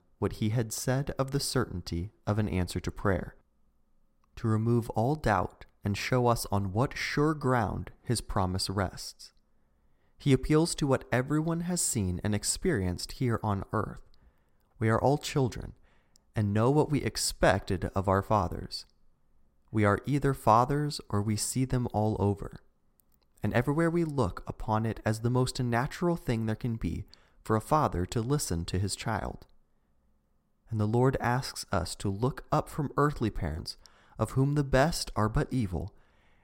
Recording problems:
none

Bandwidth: 16 kHz